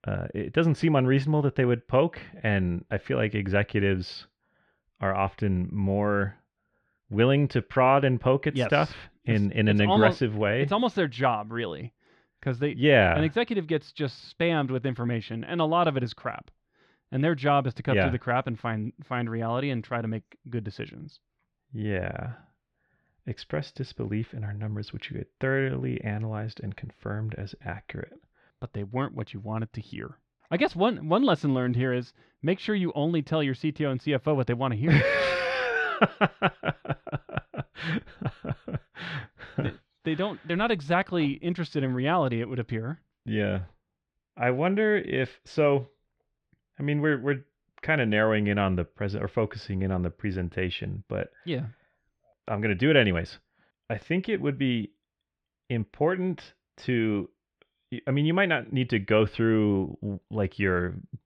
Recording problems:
muffled; slightly; fading above 2 kHz

